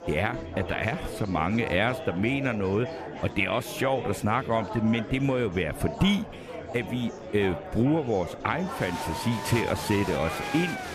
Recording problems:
murmuring crowd; loud; throughout; 9 dB below the speech

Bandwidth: 14.5 kHz